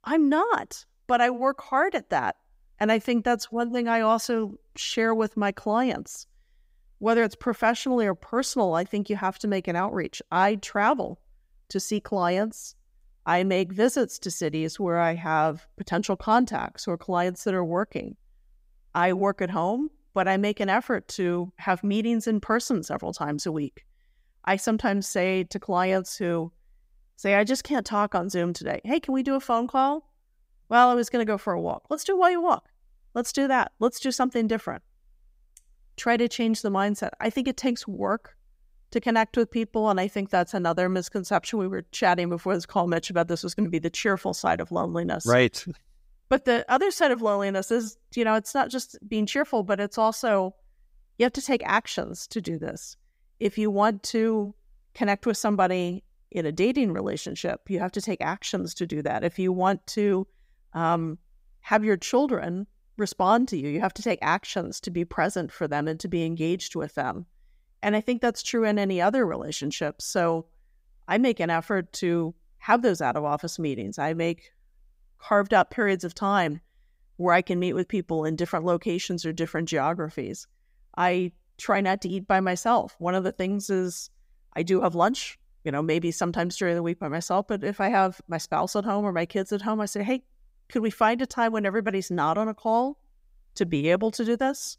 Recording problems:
none

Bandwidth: 15.5 kHz